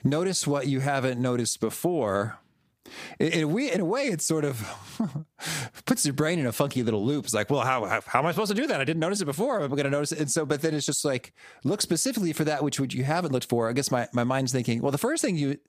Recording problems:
squashed, flat; somewhat

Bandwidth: 15 kHz